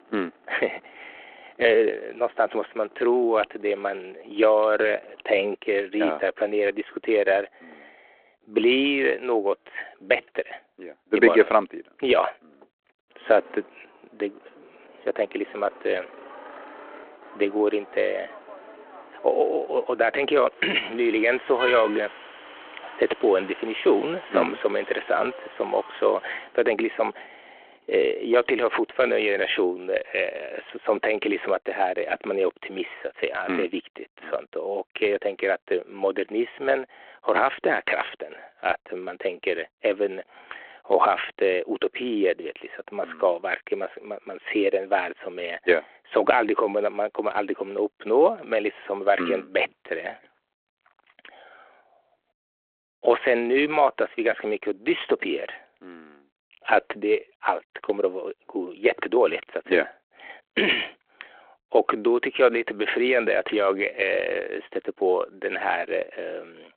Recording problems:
phone-call audio
traffic noise; noticeable; until 29 s; 15 dB below the speech

